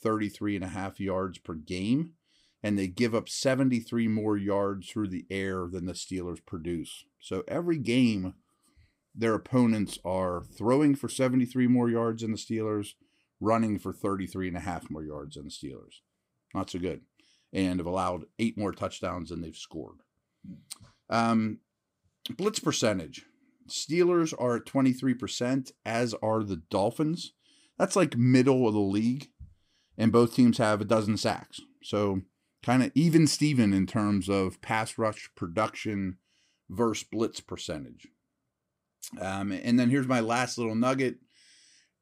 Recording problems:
none

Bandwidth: 15.5 kHz